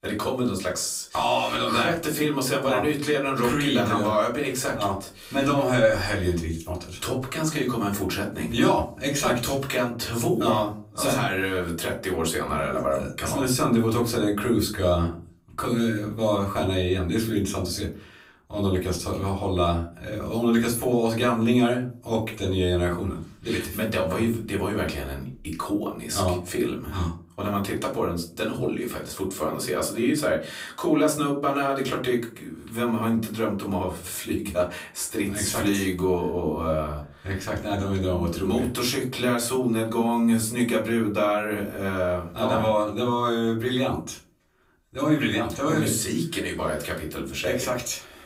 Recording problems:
off-mic speech; far
room echo; slight; dies away in 0.3 s

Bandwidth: 15.5 kHz